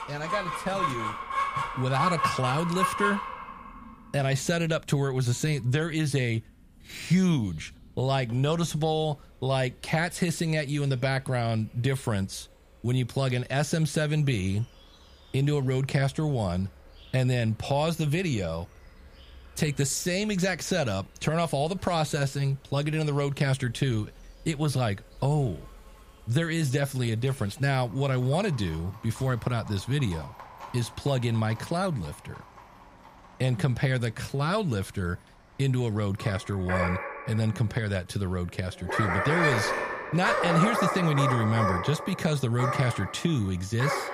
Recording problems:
animal sounds; loud; throughout; 3 dB below the speech

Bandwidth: 15 kHz